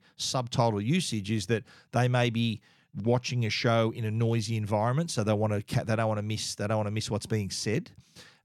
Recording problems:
none

